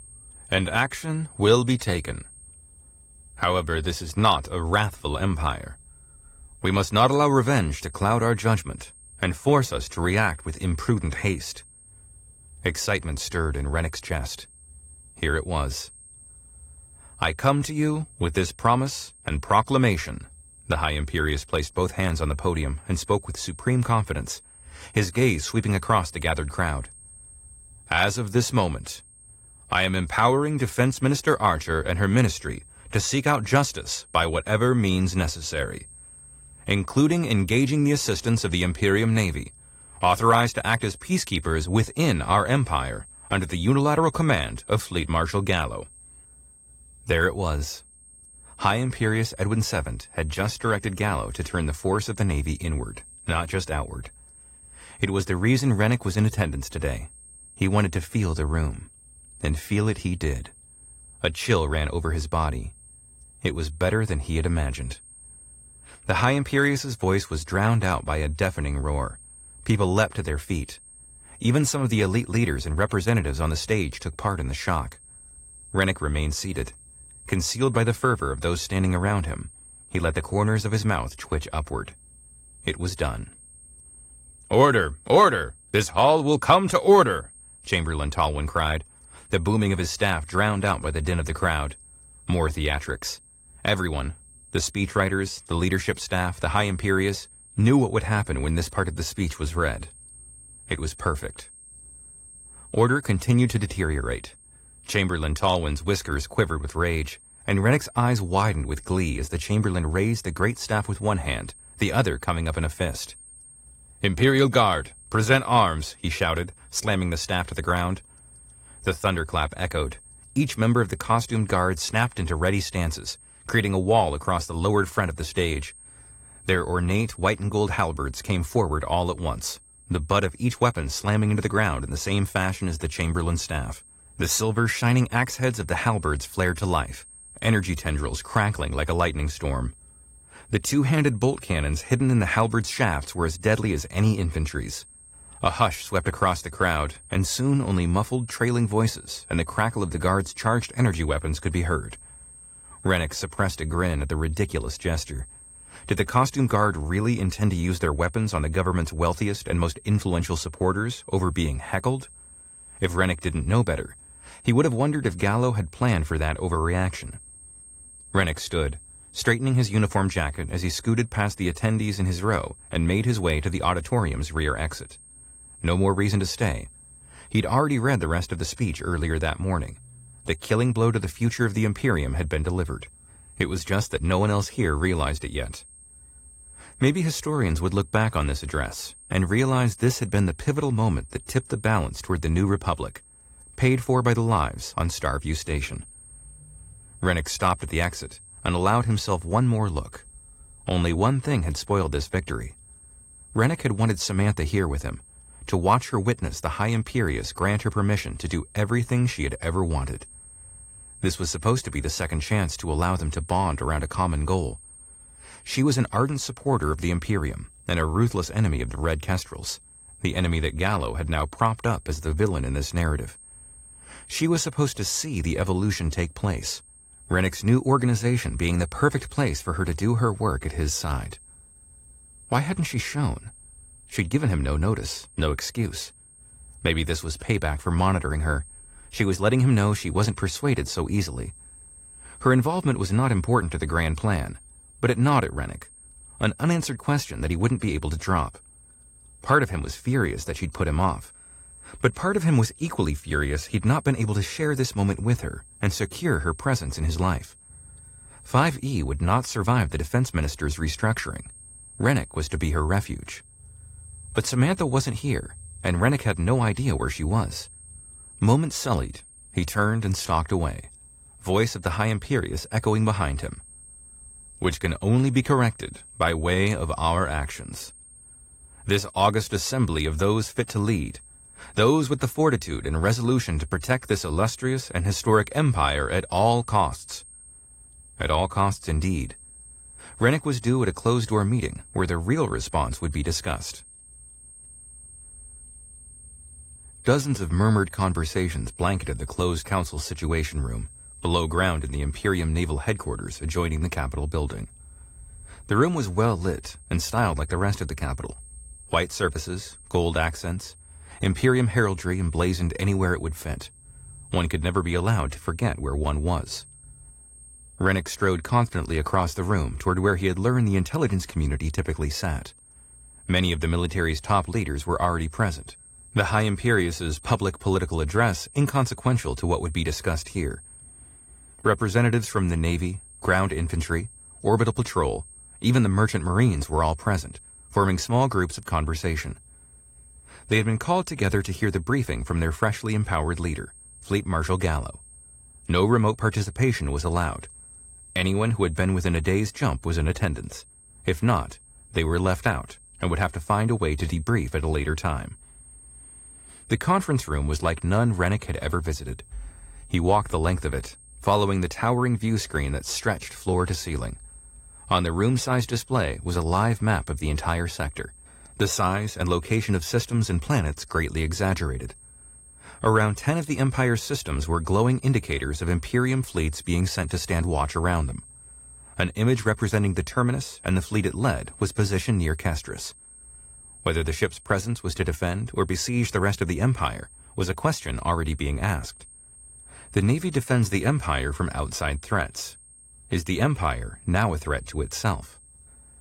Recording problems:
garbled, watery; slightly; nothing above 15 kHz
high-pitched whine; faint; throughout; 8.5 kHz, 20 dB below the speech

